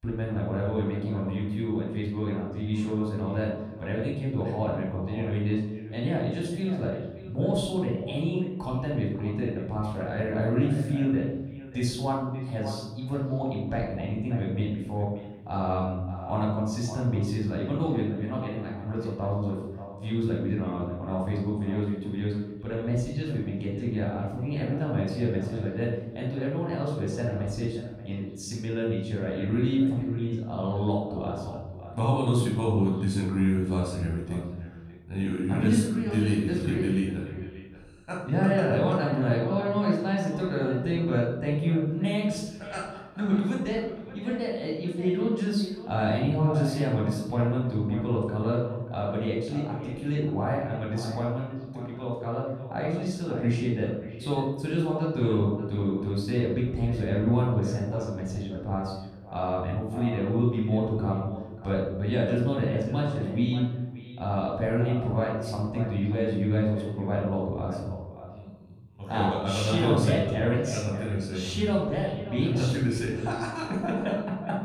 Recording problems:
off-mic speech; far
echo of what is said; noticeable; throughout; 580 ms later, 15 dB below the speech
room echo; noticeable; dies away in 0.9 s

